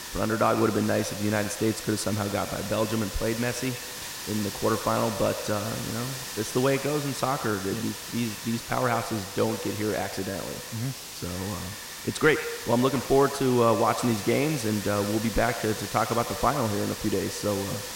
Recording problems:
echo of what is said; strong; throughout; 100 ms later, 10 dB below the speech
hiss; loud; throughout; 8 dB below the speech

